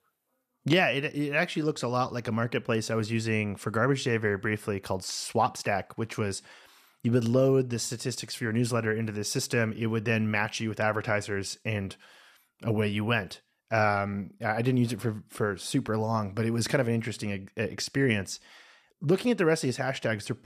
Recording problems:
none

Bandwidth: 14.5 kHz